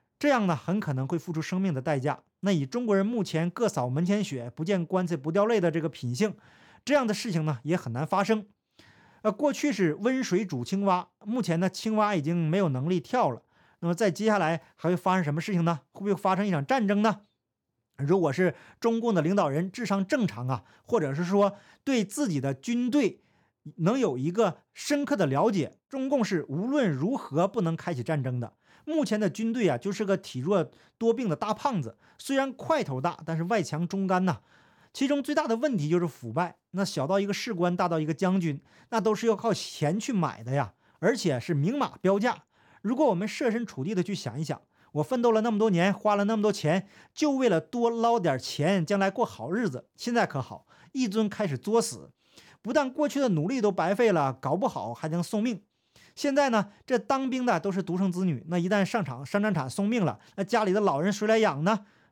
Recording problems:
none

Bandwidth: 18 kHz